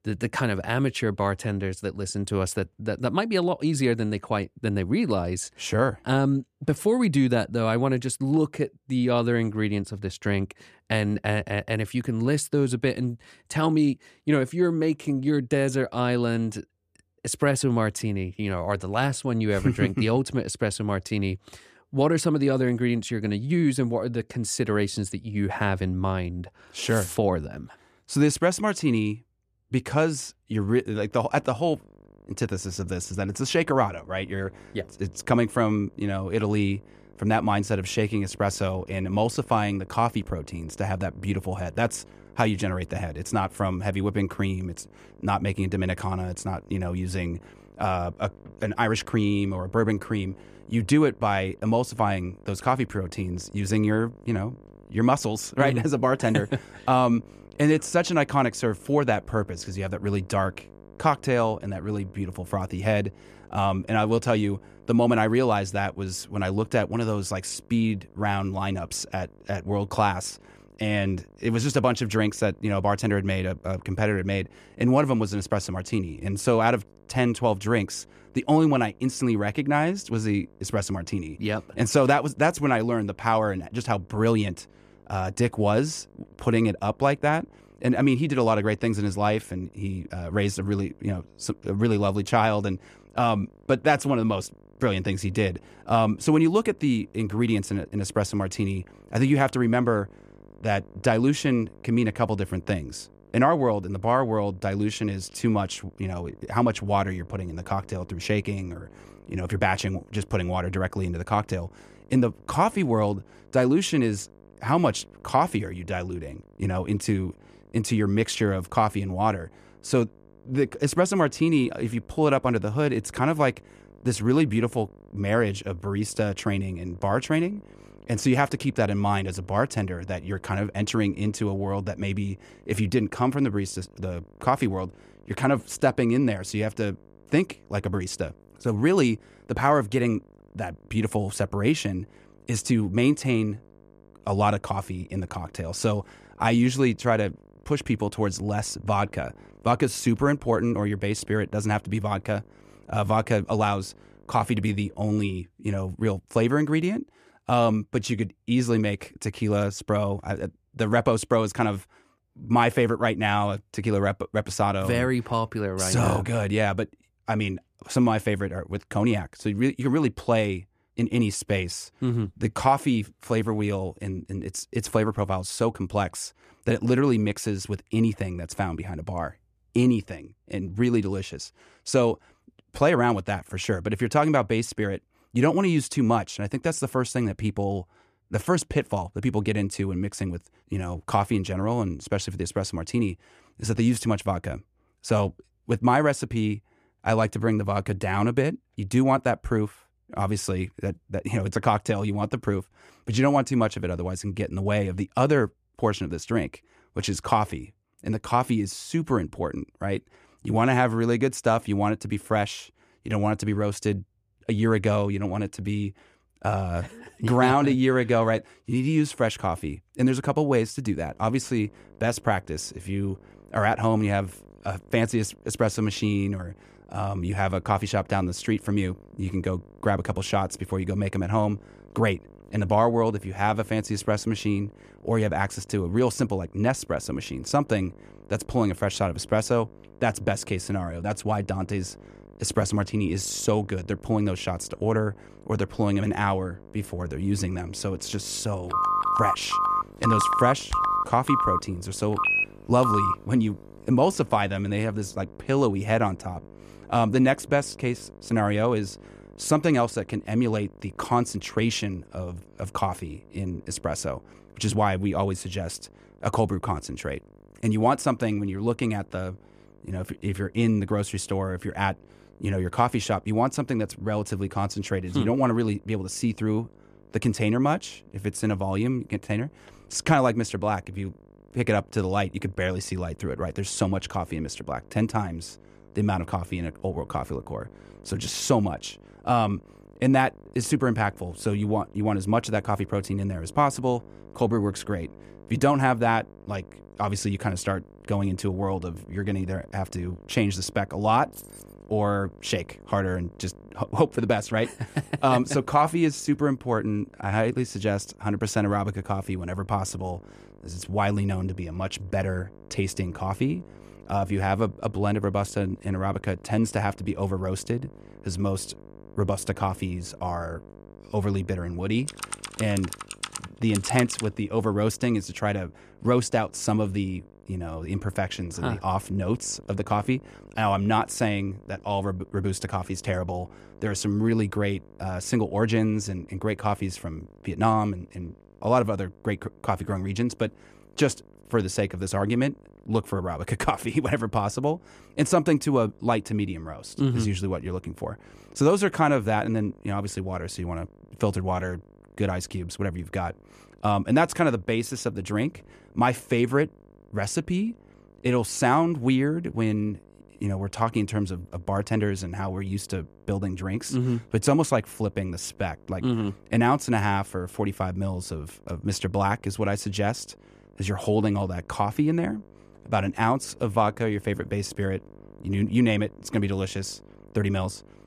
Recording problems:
electrical hum; faint; from 31 s to 2:35 and from 3:41 on; 50 Hz, 25 dB below the speech
phone ringing; loud; from 4:09 to 4:13; peak 4 dB above the speech
jangling keys; faint; at 5:01; peak 15 dB below the speech
keyboard typing; noticeable; from 5:22 to 5:24; peak 6 dB below the speech

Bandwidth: 14.5 kHz